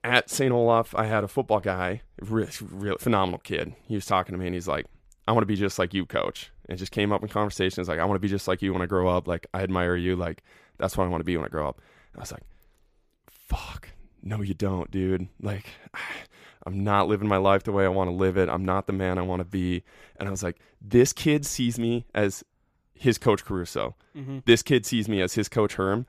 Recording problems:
none

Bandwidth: 14.5 kHz